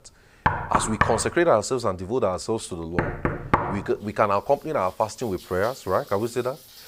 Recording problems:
rain or running water; faint; throughout; 20 dB below the speech
door banging; loud; until 3.5 s; peak 2 dB above the speech

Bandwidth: 15.5 kHz